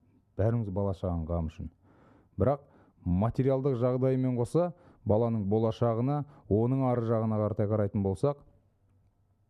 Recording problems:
muffled; very; fading above 1.5 kHz

